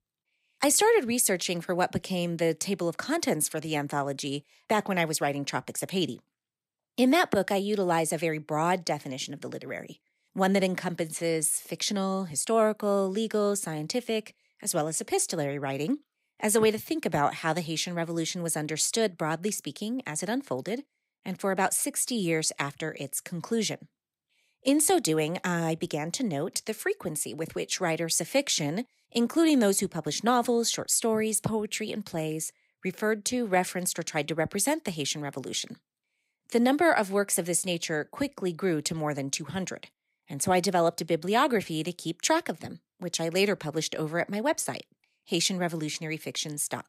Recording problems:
none

